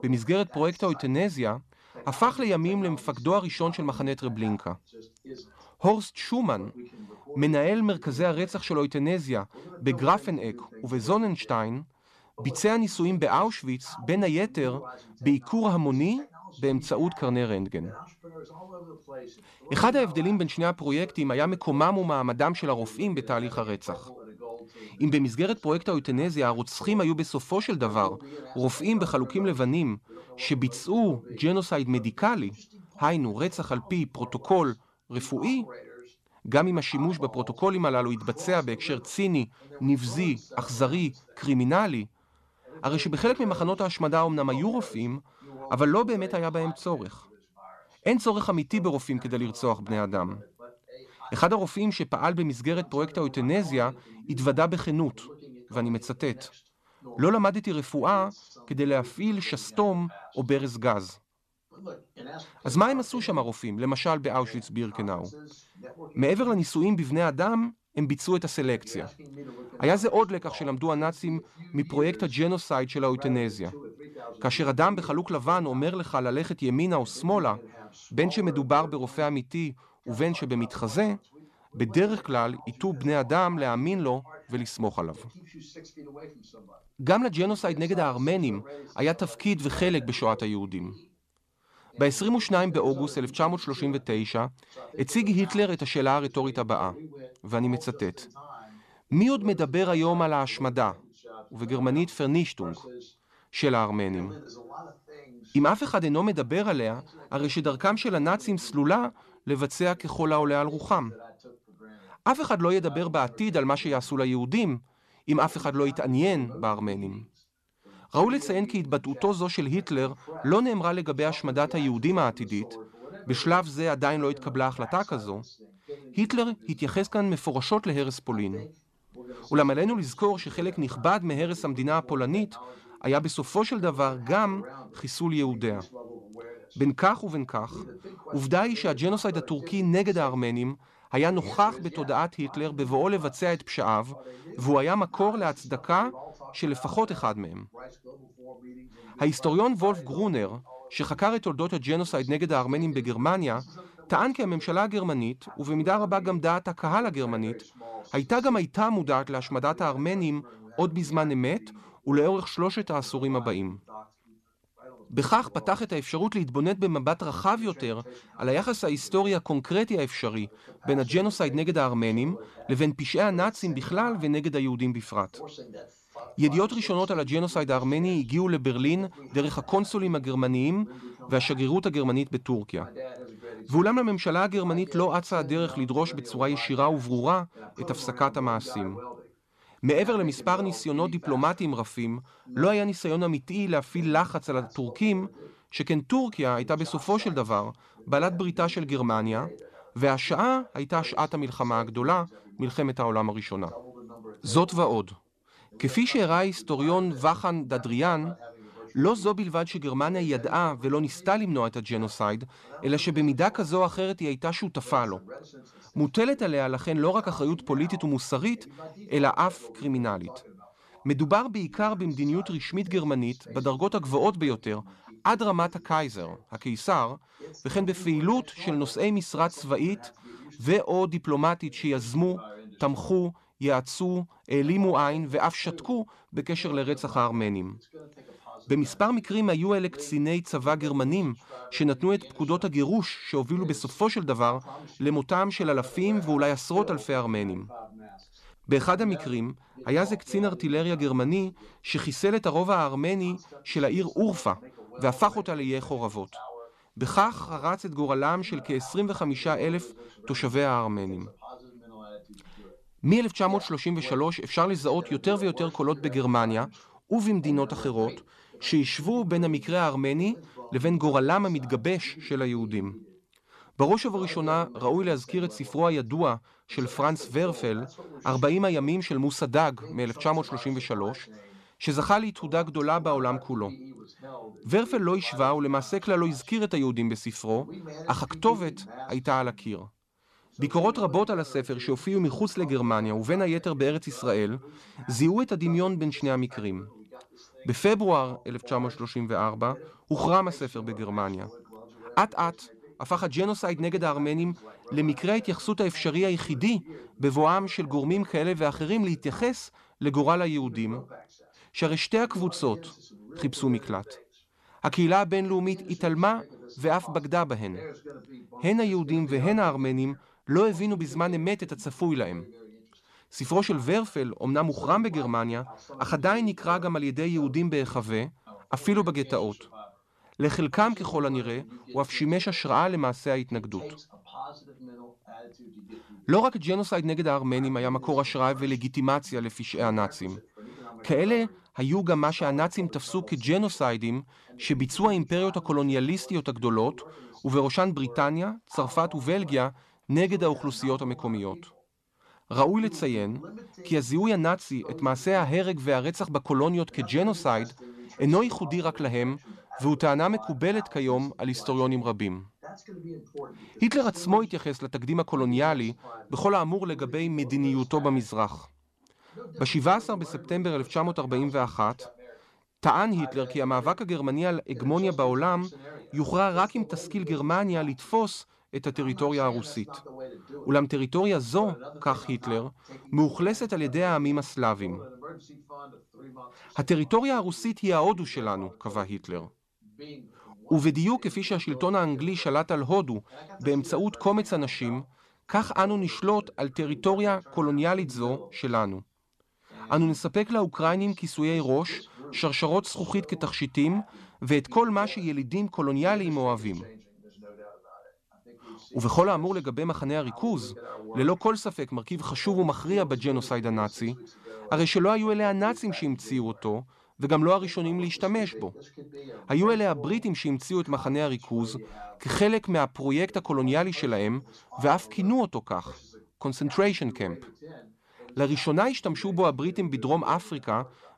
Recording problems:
voice in the background; noticeable; throughout; 20 dB below the speech

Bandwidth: 13.5 kHz